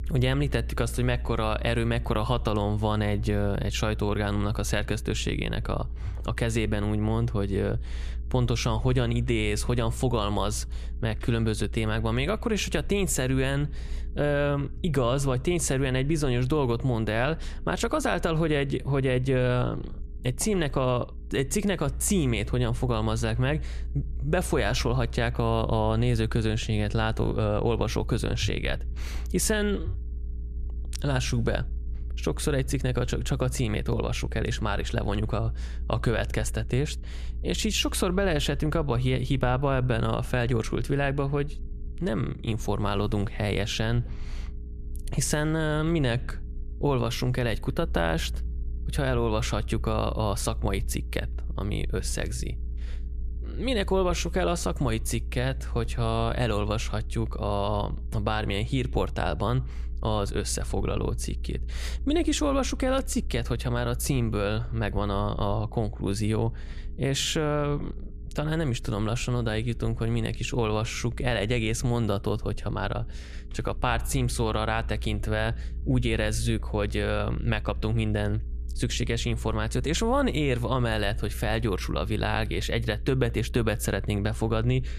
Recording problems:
low rumble; faint; throughout; 25 dB below the speech

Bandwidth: 14.5 kHz